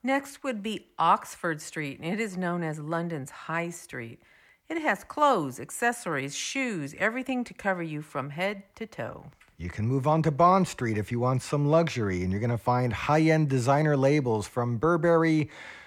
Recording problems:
none

